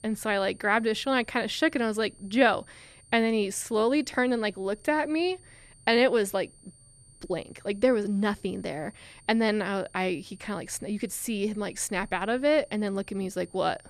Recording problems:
high-pitched whine; faint; throughout; 9 kHz, 25 dB below the speech

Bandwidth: 13.5 kHz